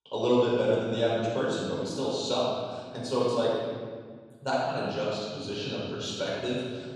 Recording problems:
room echo; strong; dies away in 1.8 s
off-mic speech; far

